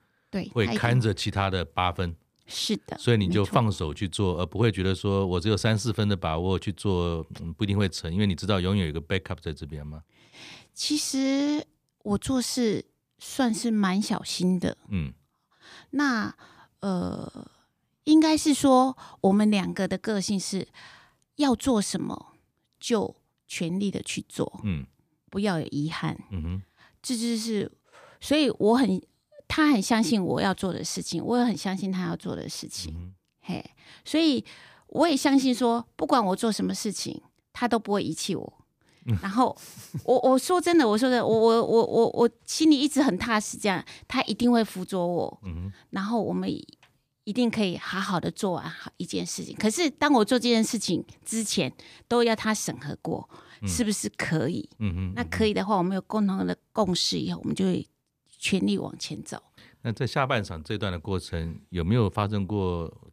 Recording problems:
none

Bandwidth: 15 kHz